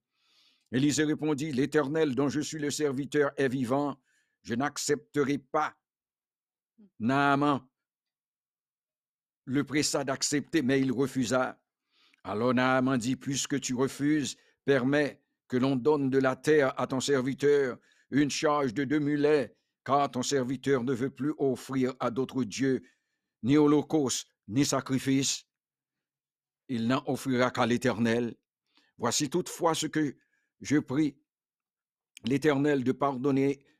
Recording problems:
none

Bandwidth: 14.5 kHz